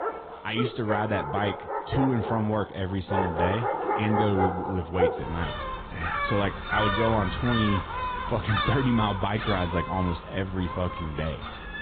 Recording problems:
garbled, watery; badly
high frequencies cut off; severe; nothing above 3.5 kHz
animal sounds; loud; throughout; 2 dB below the speech

